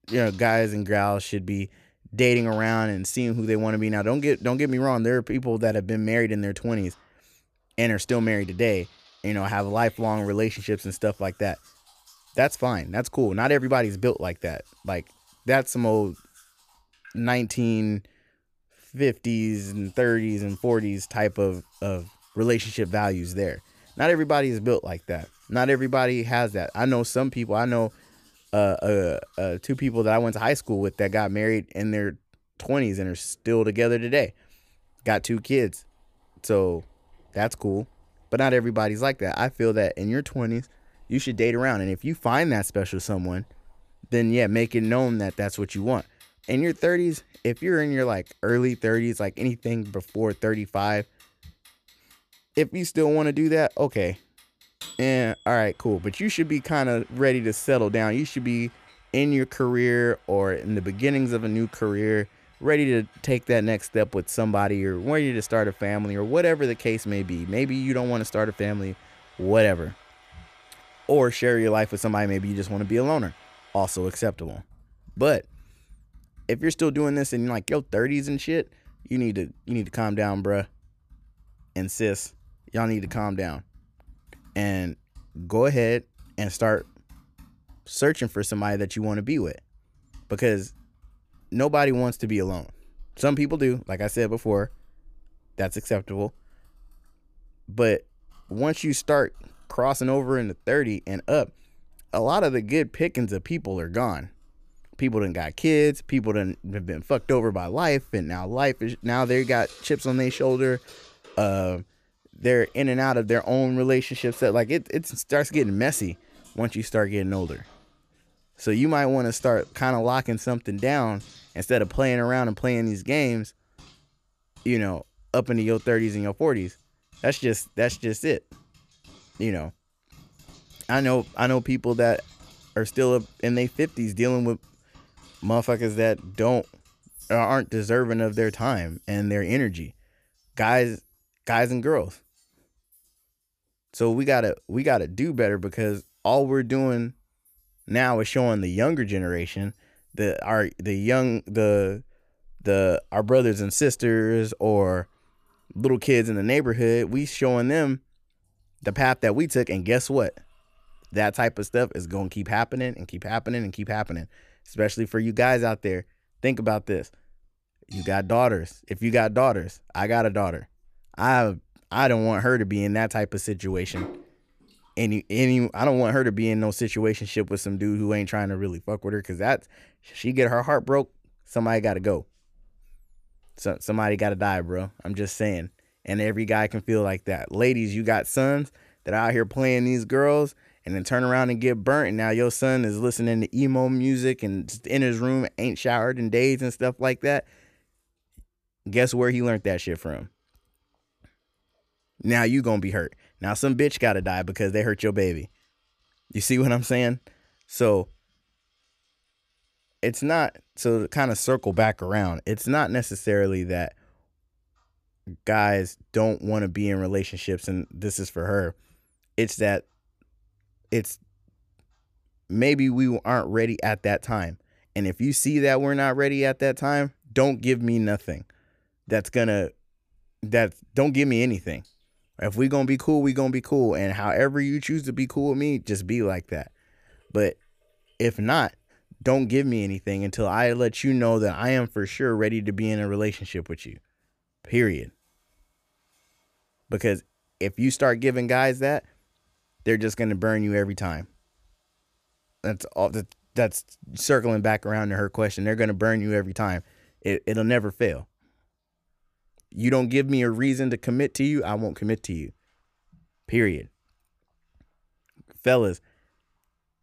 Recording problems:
household noises; faint; throughout; 30 dB below the speech

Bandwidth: 14.5 kHz